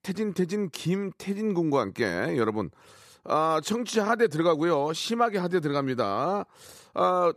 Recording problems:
none

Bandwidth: 14.5 kHz